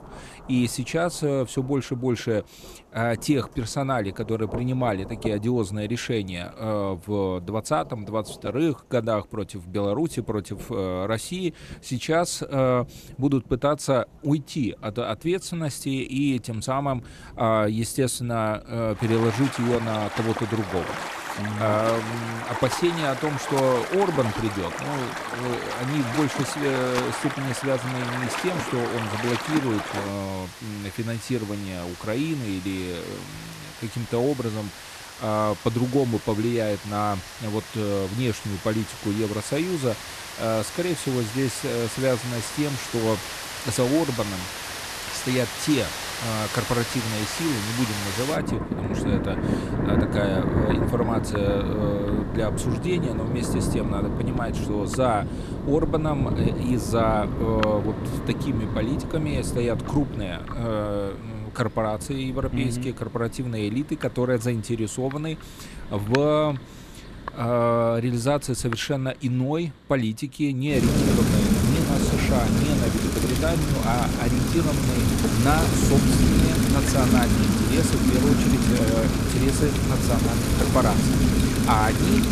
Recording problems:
rain or running water; loud; throughout; as loud as the speech

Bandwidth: 14.5 kHz